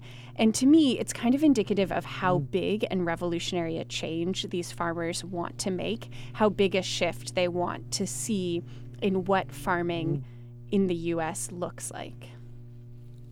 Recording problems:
electrical hum; faint; throughout; 60 Hz, 25 dB below the speech

